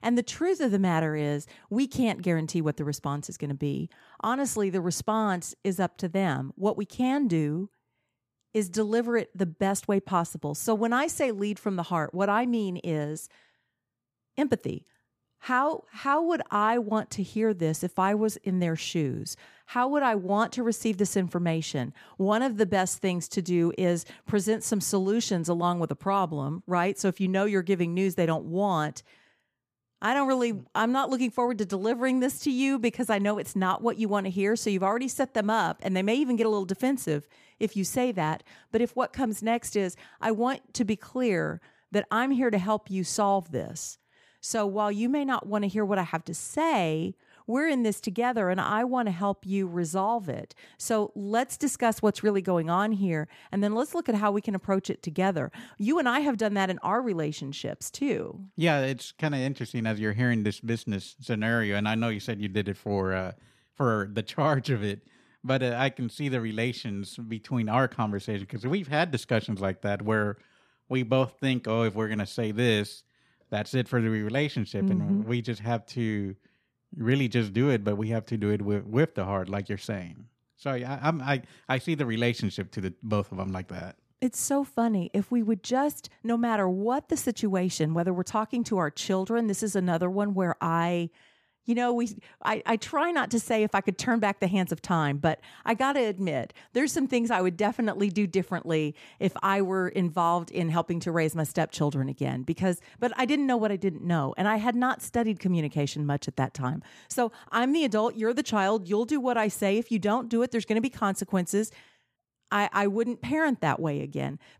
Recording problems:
none

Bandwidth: 14.5 kHz